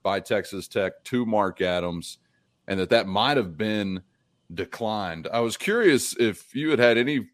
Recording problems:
none

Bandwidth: 14.5 kHz